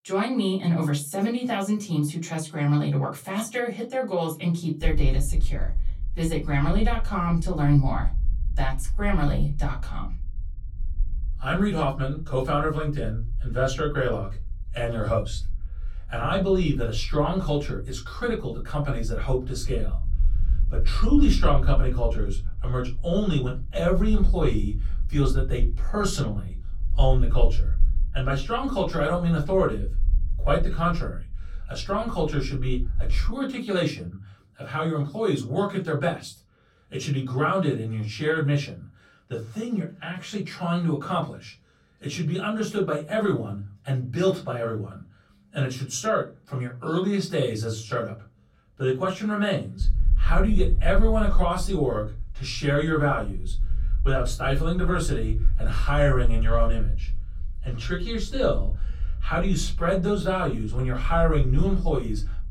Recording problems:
off-mic speech; far
room echo; very slight; dies away in 0.3 s
low rumble; faint; from 5 to 33 s and from 50 s on; 25 dB below the speech

